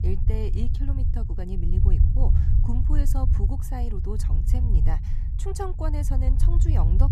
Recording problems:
low rumble; loud; throughout; 3 dB below the speech

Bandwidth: 14.5 kHz